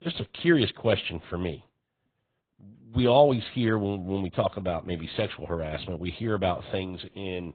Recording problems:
high frequencies cut off; severe; nothing above 4 kHz
garbled, watery; slightly

